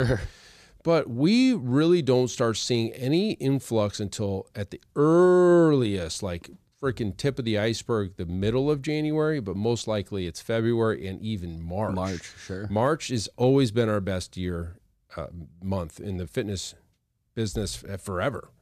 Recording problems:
abrupt cut into speech; at the start

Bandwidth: 14.5 kHz